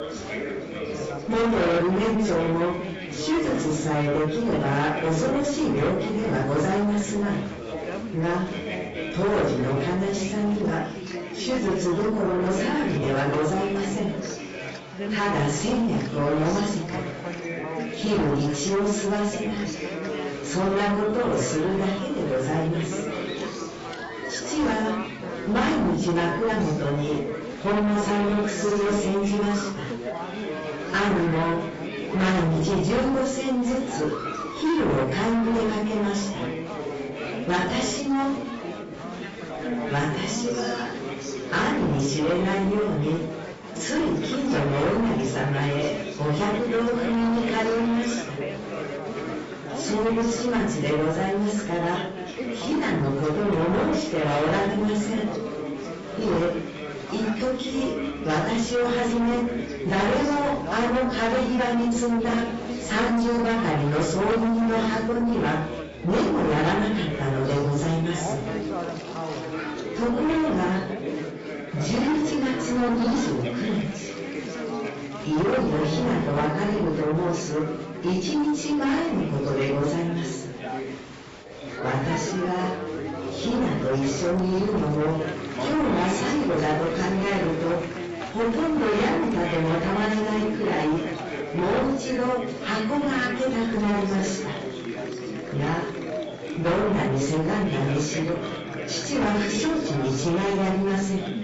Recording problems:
distortion; heavy; 7 dB below the speech
off-mic speech; far
garbled, watery; badly; nothing above 7.5 kHz
room echo; noticeable; dies away in 0.4 s
chatter from many people; loud; throughout; 8 dB below the speech
background music; noticeable; from 33 s on; 20 dB below the speech

